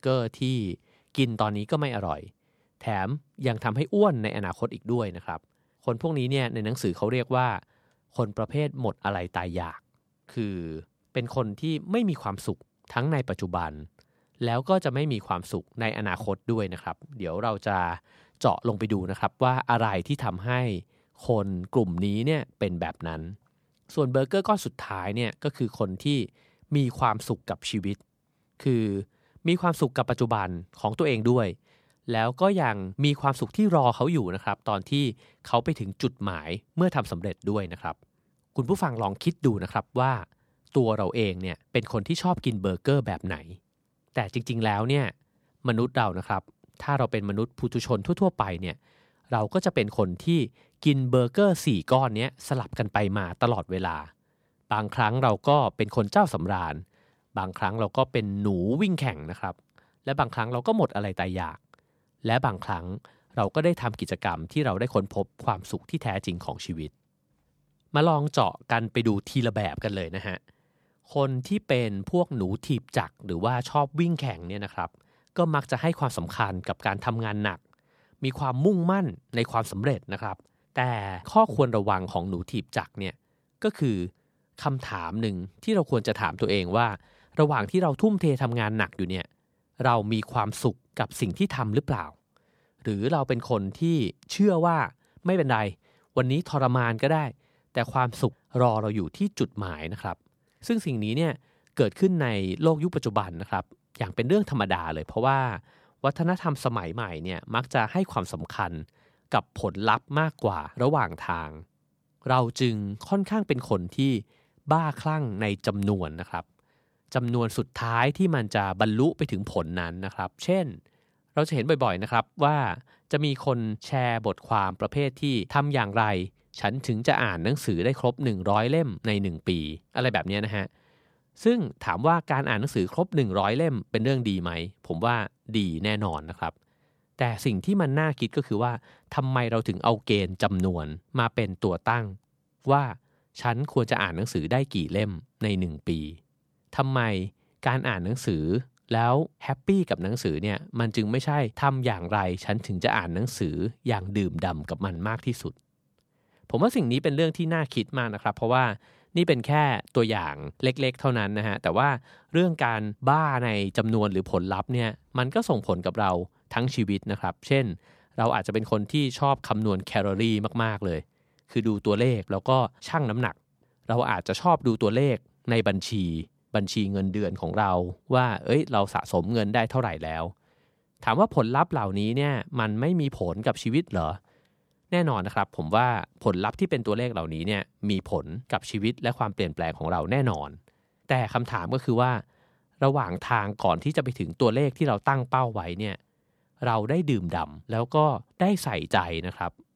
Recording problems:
none

